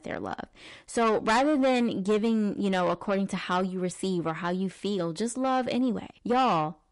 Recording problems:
distortion; heavy; 8 dB below the speech
garbled, watery; slightly; nothing above 11 kHz

